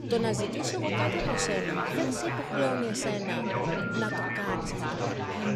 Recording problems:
chatter from many people; very loud; throughout; 2 dB above the speech
phone ringing; noticeable; from 1 to 2.5 s; peak 8 dB below the speech
phone ringing; loud; from 3.5 to 4.5 s; peak level with the speech

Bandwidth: 14.5 kHz